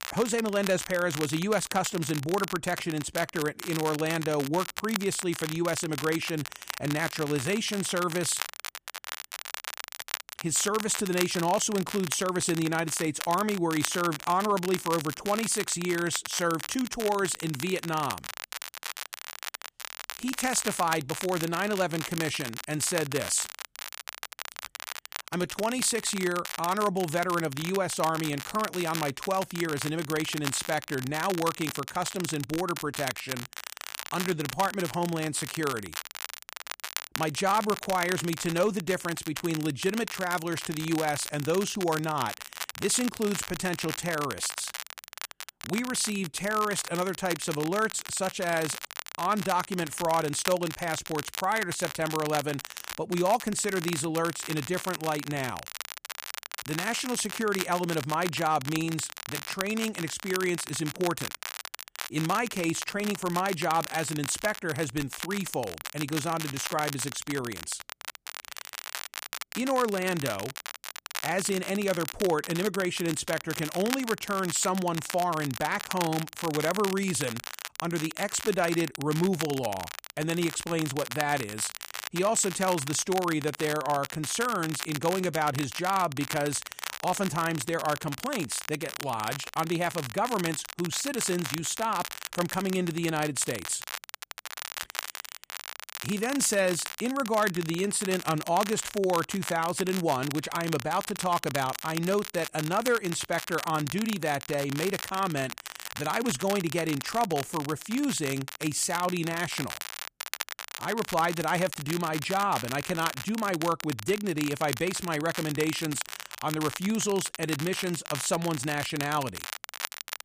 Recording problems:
crackle, like an old record; loud; 8 dB below the speech

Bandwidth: 15 kHz